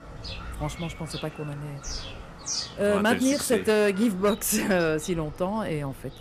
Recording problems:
animal sounds; noticeable; throughout; 10 dB below the speech

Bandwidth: 15 kHz